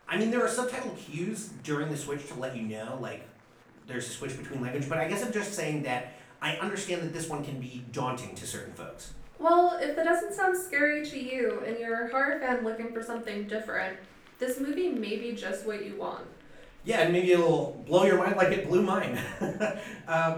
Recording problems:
off-mic speech; far
room echo; slight; dies away in 0.4 s
murmuring crowd; faint; throughout; 30 dB below the speech

